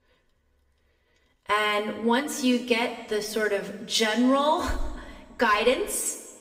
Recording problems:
room echo; slight; dies away in 1.4 s
off-mic speech; somewhat distant

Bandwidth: 15.5 kHz